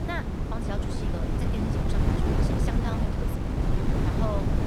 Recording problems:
wind noise on the microphone; heavy; 4 dB above the speech
uneven, jittery; strongly; from 0.5 to 4 s

